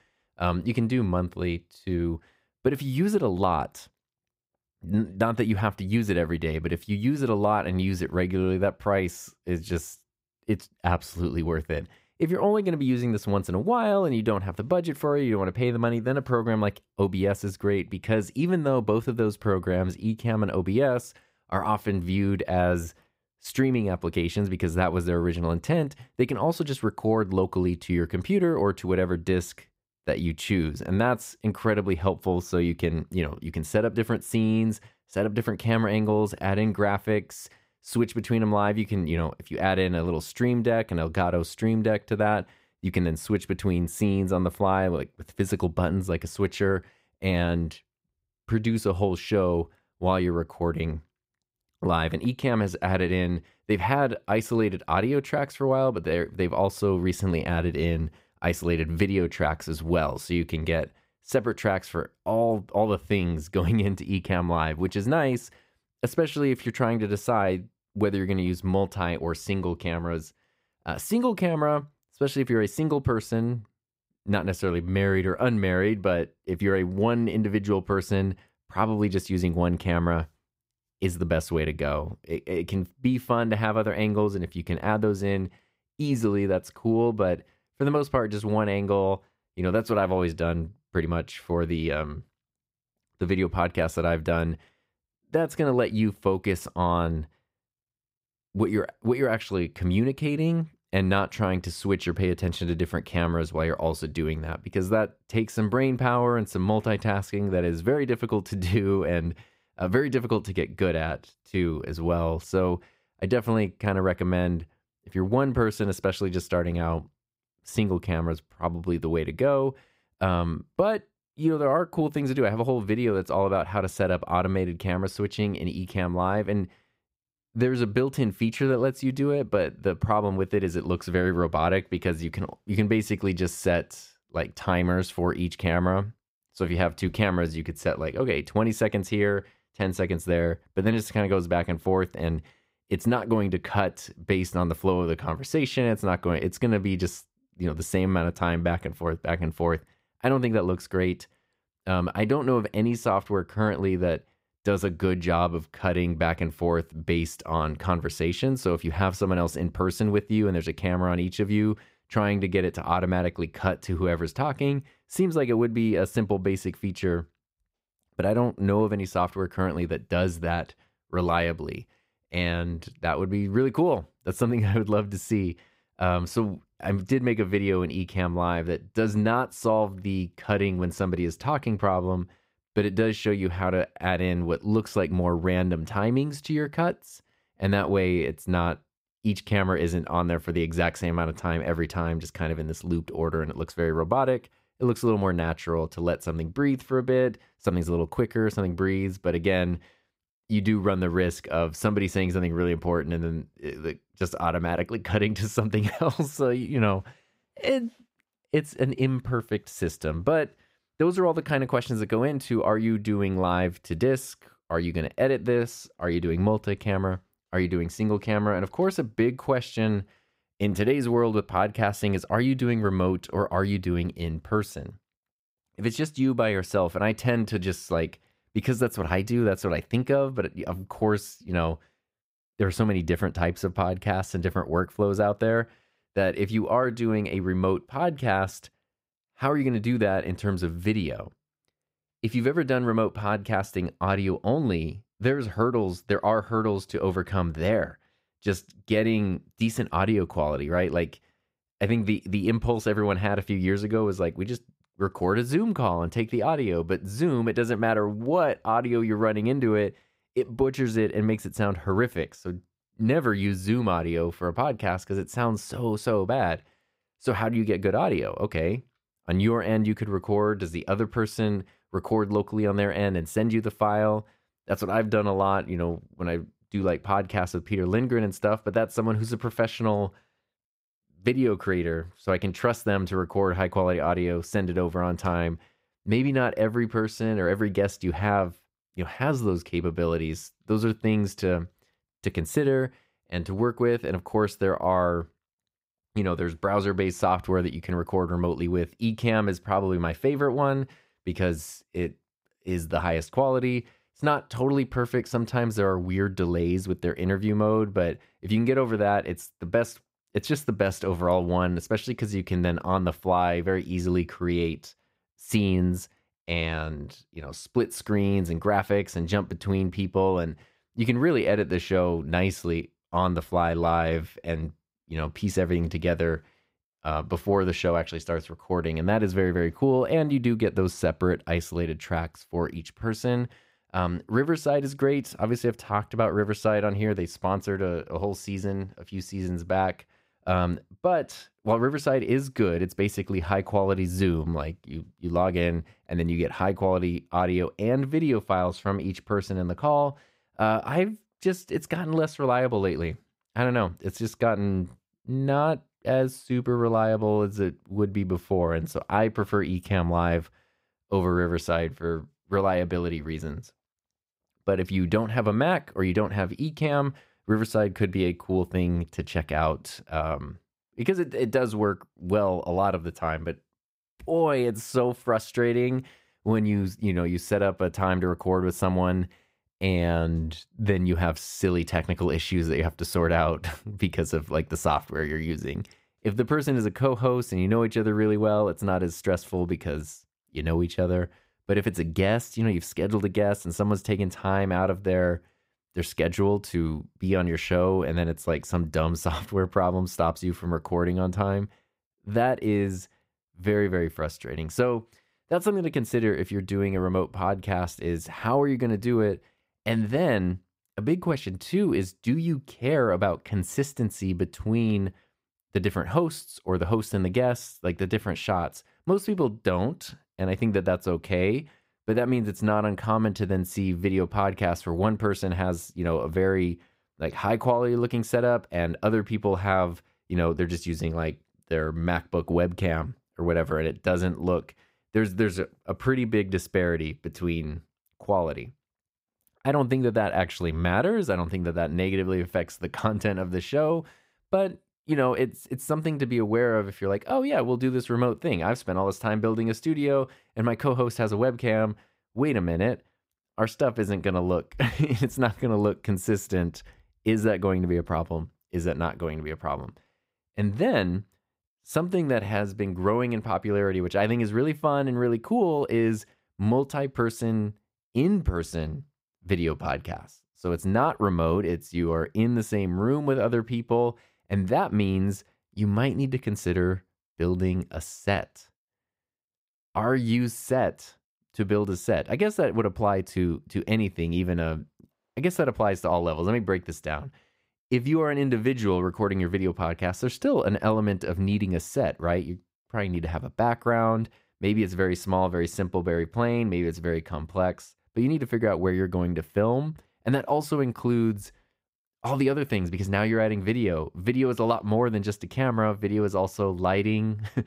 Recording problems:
none

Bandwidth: 15.5 kHz